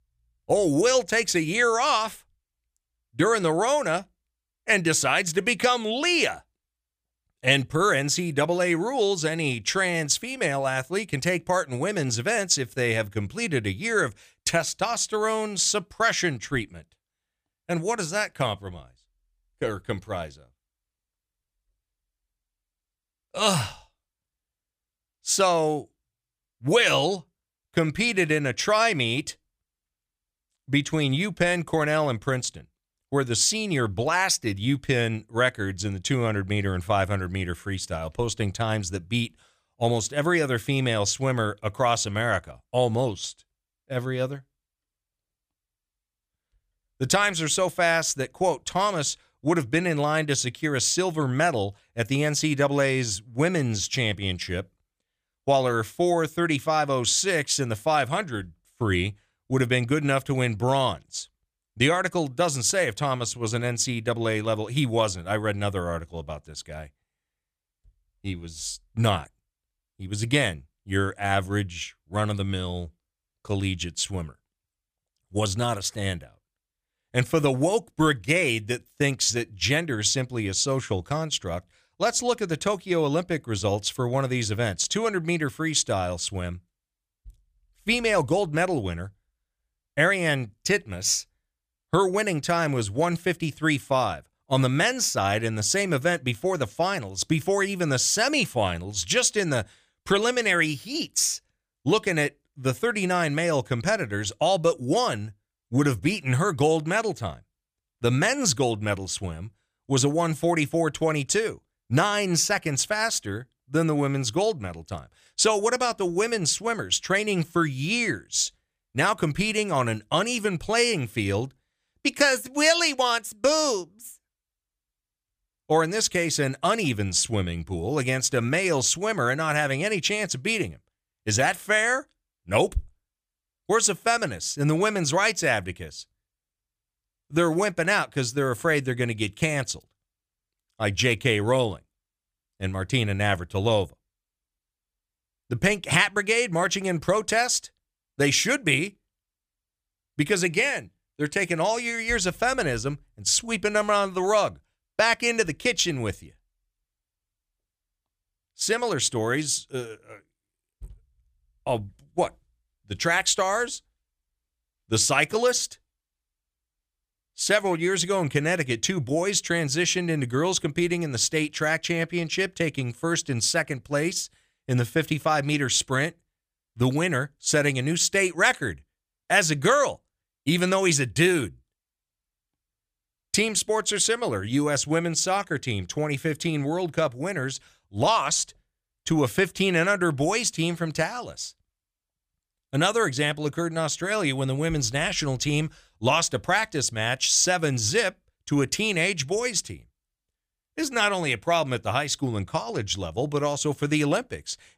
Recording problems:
none

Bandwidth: 15 kHz